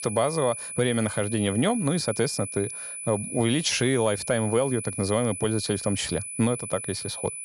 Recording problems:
high-pitched whine; loud; throughout; 10 kHz, 7 dB below the speech

